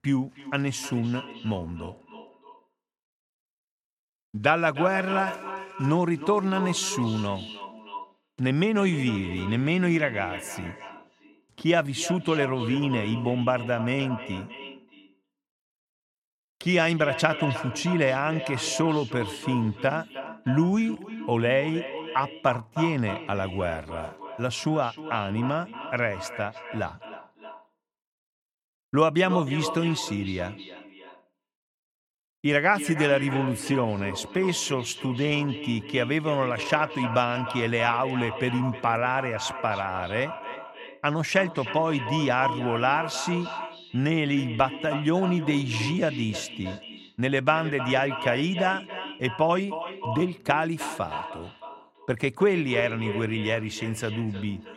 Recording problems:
echo of what is said; strong; throughout; 310 ms later, 10 dB below the speech

